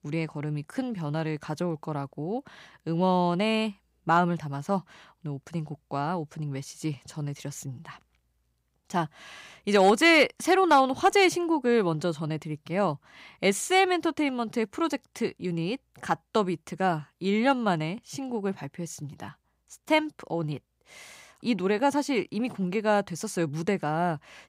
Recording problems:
none

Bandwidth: 15.5 kHz